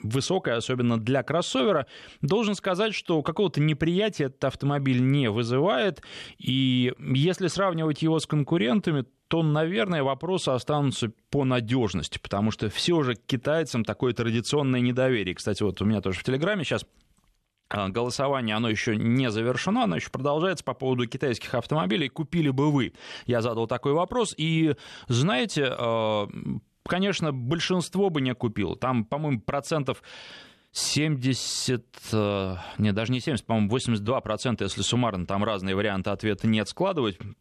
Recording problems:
none

